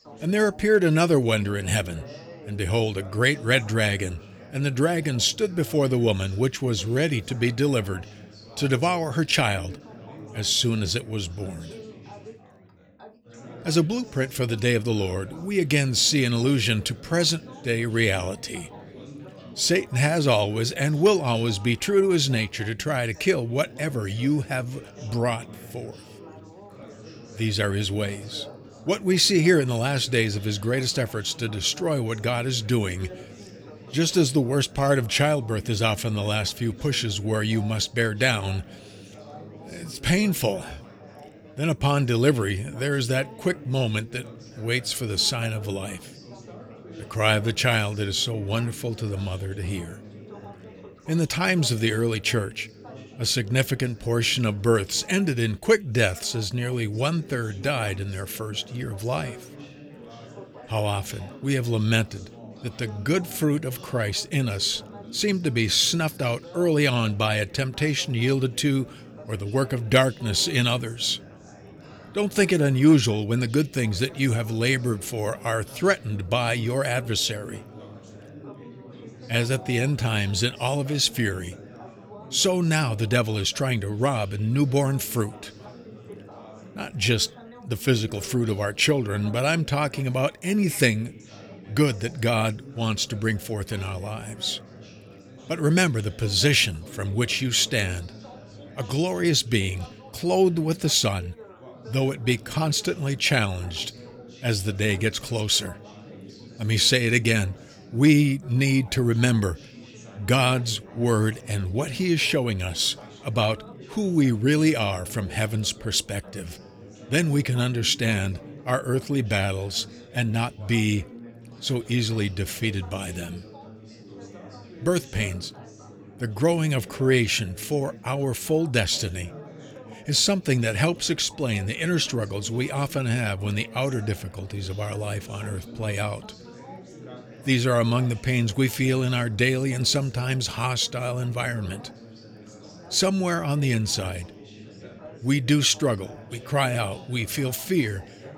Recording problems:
chatter from many people; noticeable; throughout; 20 dB below the speech

